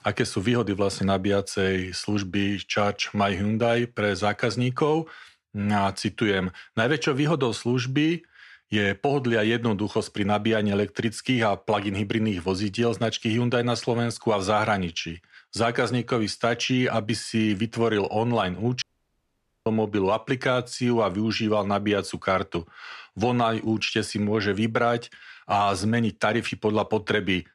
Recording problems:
audio cutting out; at 19 s for 1 s

